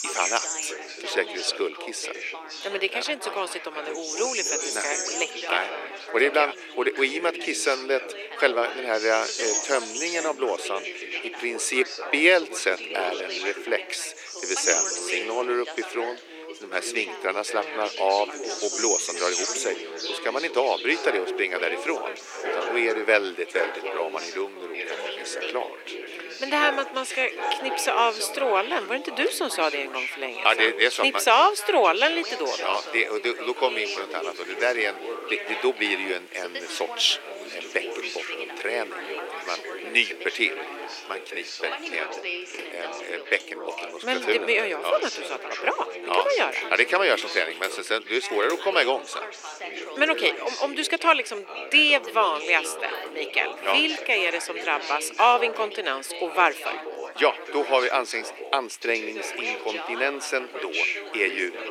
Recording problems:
thin; very; fading below 350 Hz
animal sounds; loud; throughout; 7 dB below the speech
background chatter; loud; throughout; 3 voices, 9 dB below the speech

